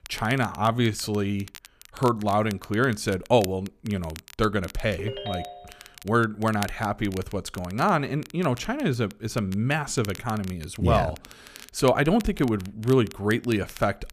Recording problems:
crackle, like an old record; noticeable; 20 dB below the speech
phone ringing; noticeable; at 5 s; peak 8 dB below the speech

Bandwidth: 14.5 kHz